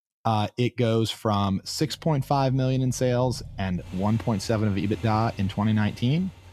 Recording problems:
traffic noise; noticeable; from 2 s on; 20 dB below the speech

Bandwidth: 14.5 kHz